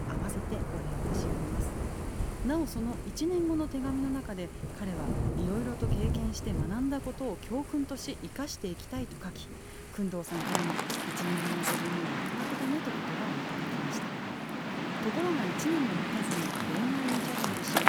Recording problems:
rain or running water; very loud; throughout; 1 dB above the speech
hiss; faint; throughout; 20 dB below the speech

